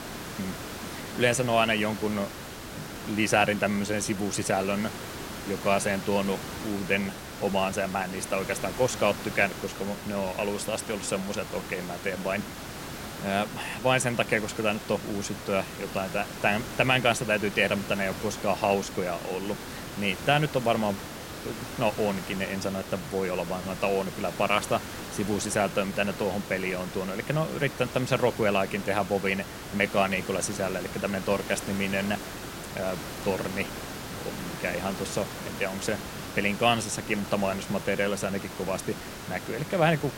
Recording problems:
hiss; loud; throughout; 9 dB below the speech

